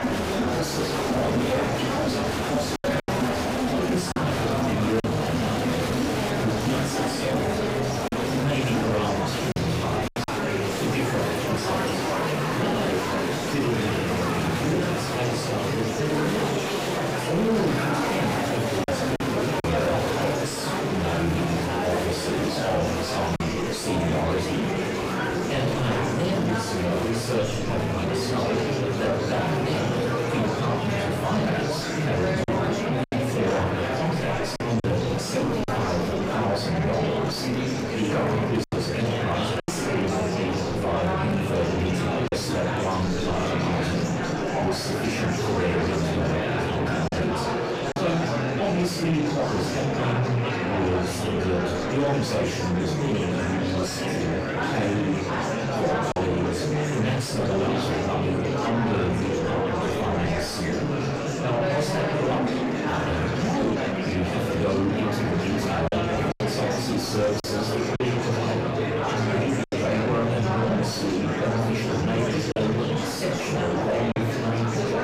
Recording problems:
off-mic speech; far
room echo; noticeable; dies away in 0.5 s
distortion; slight; 10 dB below the speech
murmuring crowd; very loud; throughout; 1 dB above the speech
choppy; occasionally; 2% of the speech affected

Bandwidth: 15.5 kHz